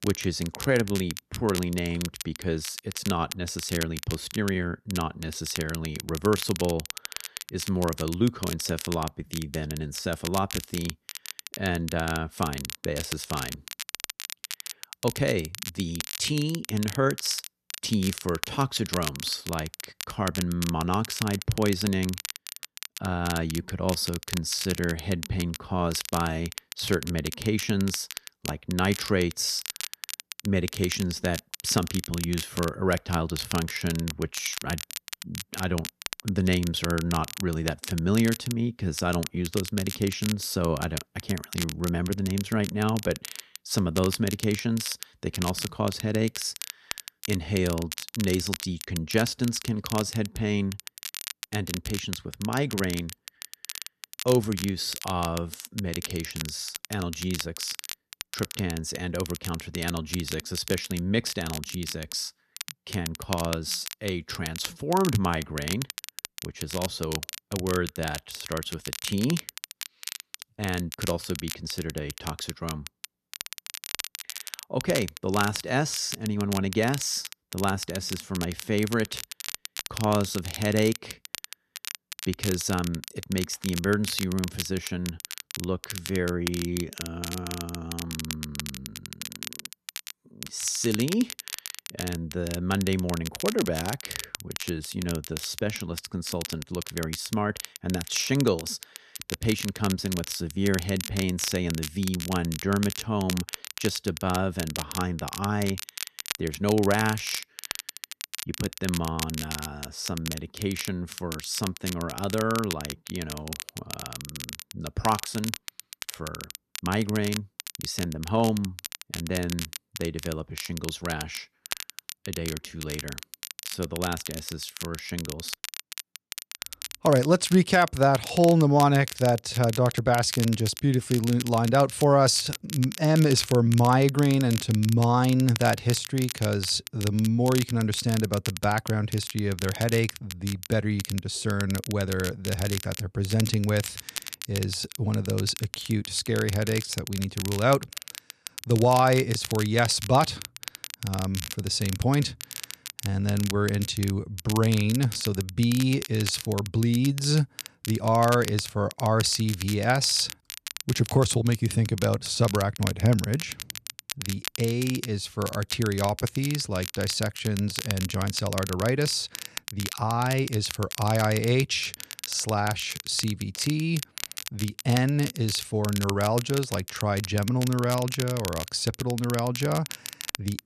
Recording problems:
crackle, like an old record; loud; 9 dB below the speech

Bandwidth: 14 kHz